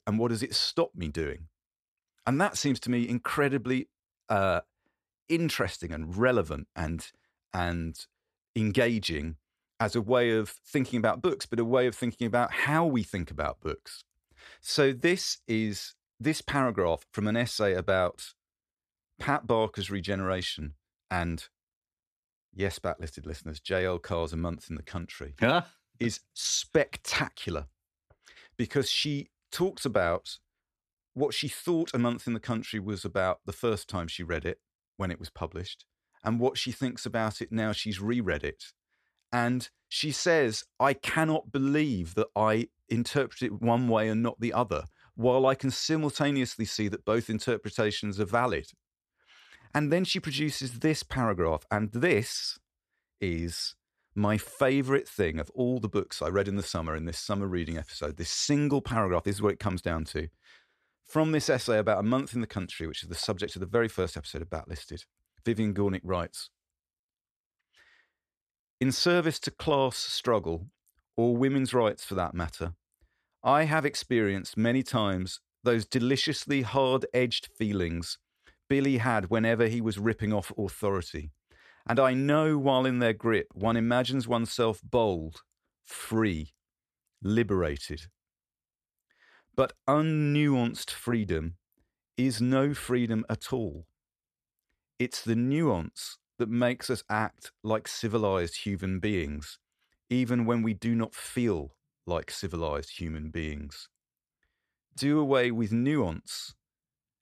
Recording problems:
none

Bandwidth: 14 kHz